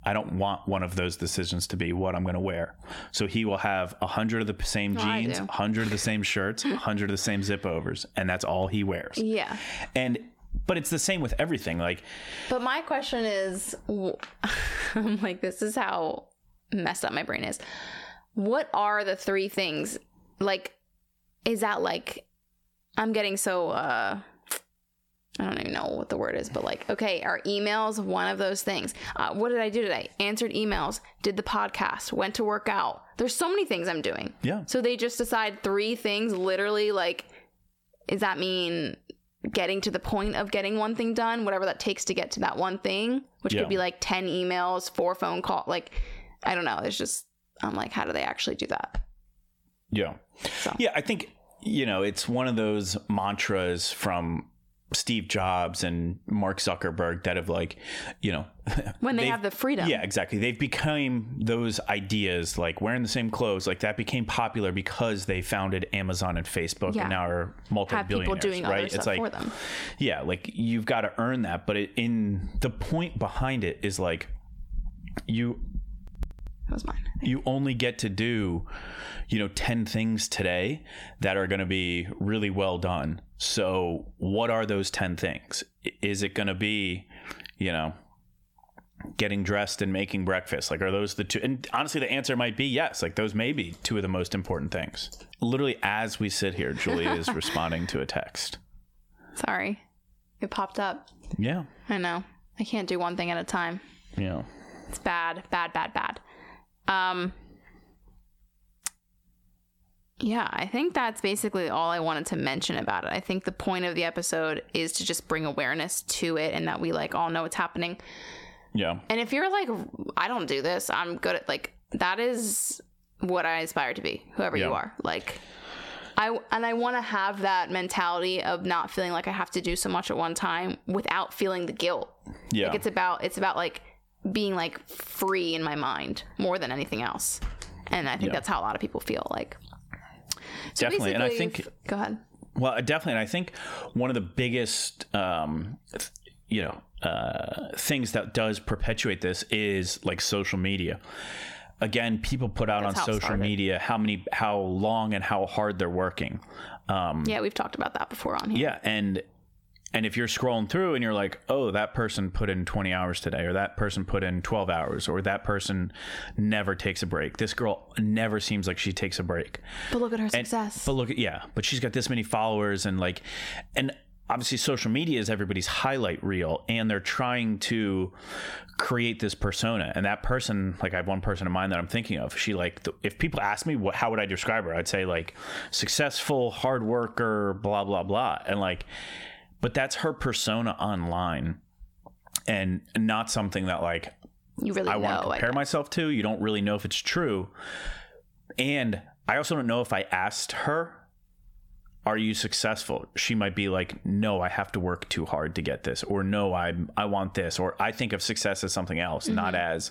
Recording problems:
squashed, flat; heavily

